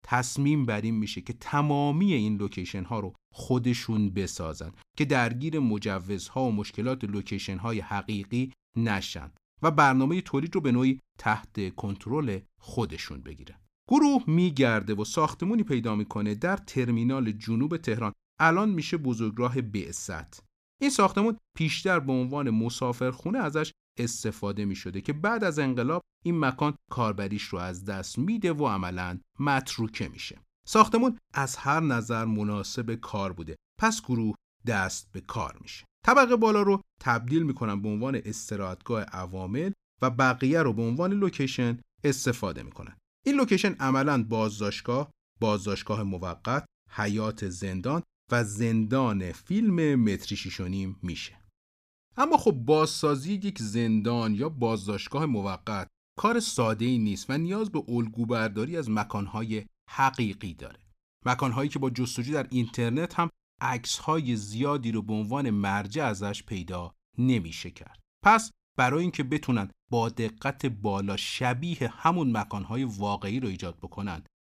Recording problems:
none

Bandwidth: 14.5 kHz